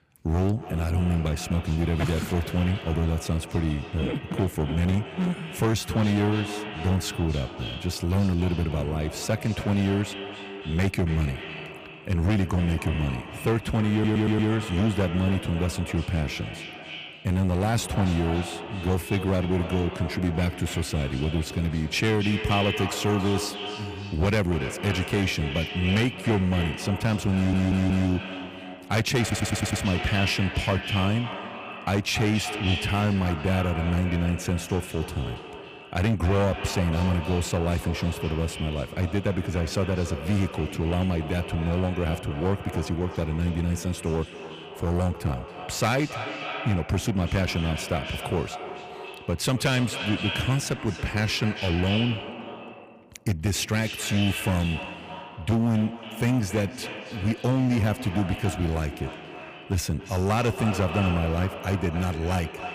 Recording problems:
echo of what is said; strong; throughout; 280 ms later, 9 dB below the speech
distortion; slight; 11% of the sound clipped
audio stuttering; at 14 s, at 27 s and at 29 s

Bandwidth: 15 kHz